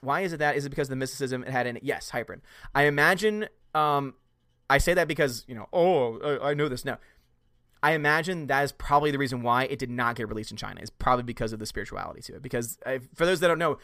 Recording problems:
none

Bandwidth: 15 kHz